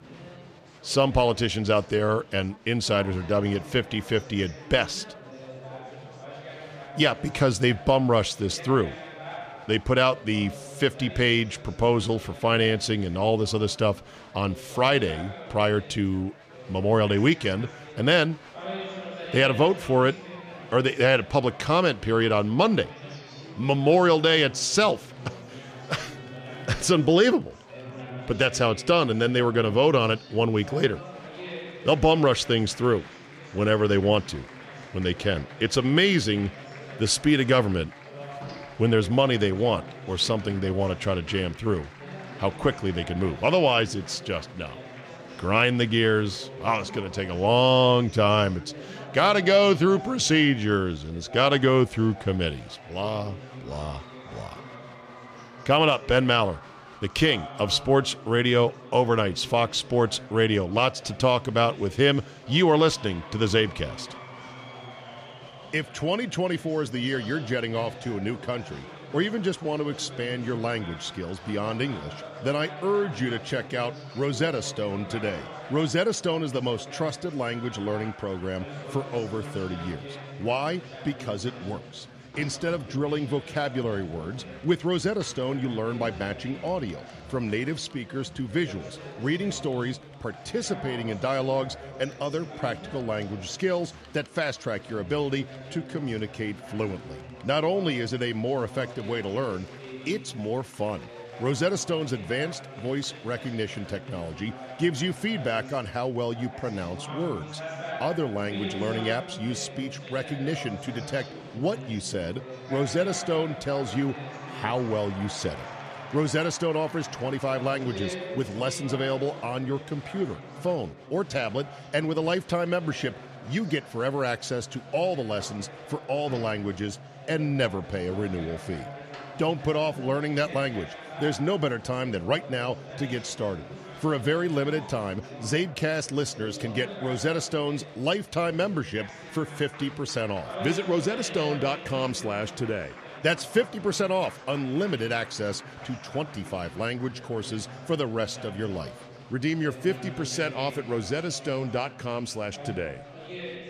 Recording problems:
chatter from many people; noticeable; throughout; 15 dB below the speech

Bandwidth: 15 kHz